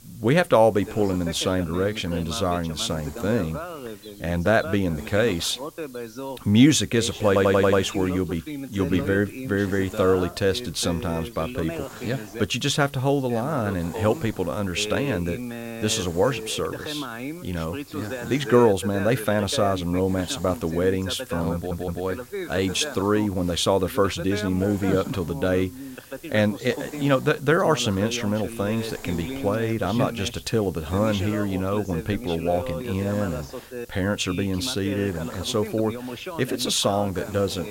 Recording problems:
voice in the background; noticeable; throughout; 10 dB below the speech
hiss; faint; throughout; 20 dB below the speech
audio stuttering; at 7.5 s and at 22 s

